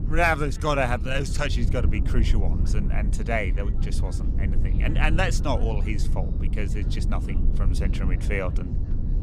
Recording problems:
low rumble; noticeable; throughout; 15 dB below the speech
background chatter; faint; throughout; 4 voices, 25 dB below the speech

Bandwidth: 15.5 kHz